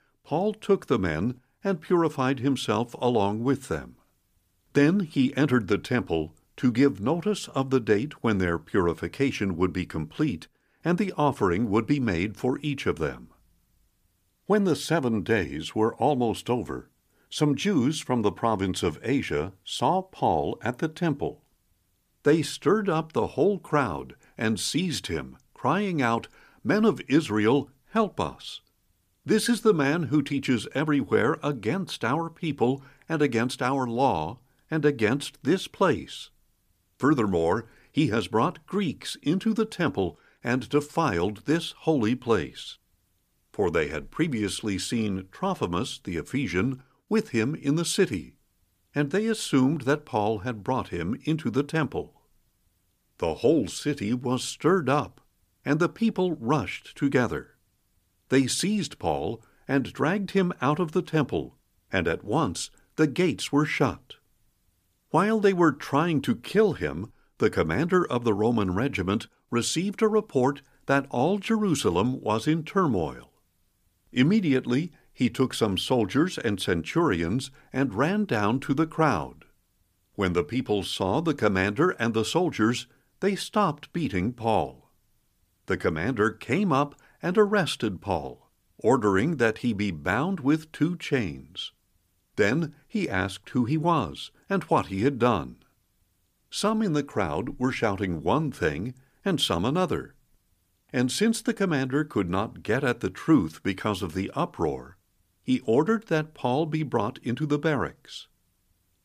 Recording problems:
none

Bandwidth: 15 kHz